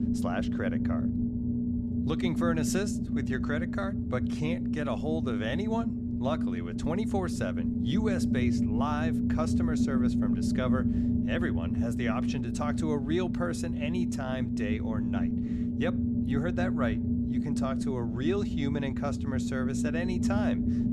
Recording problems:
low rumble; loud; throughout; as loud as the speech

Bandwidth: 13.5 kHz